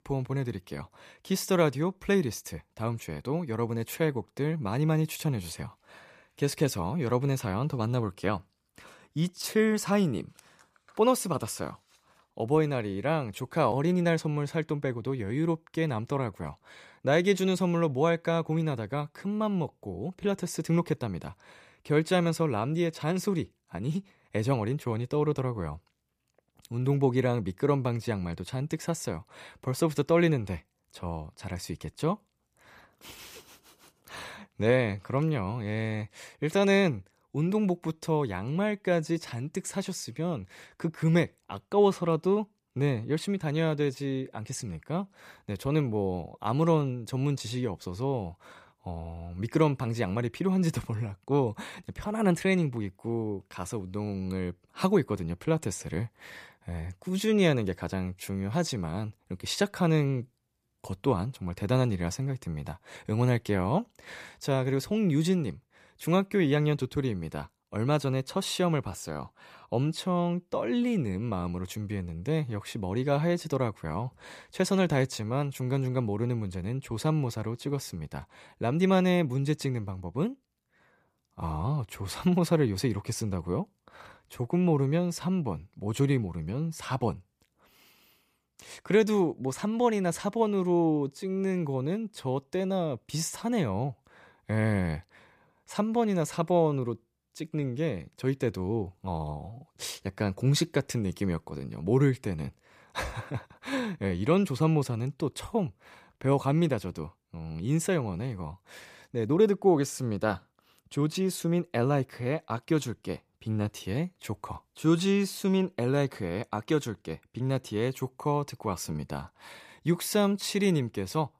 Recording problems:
none

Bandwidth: 14.5 kHz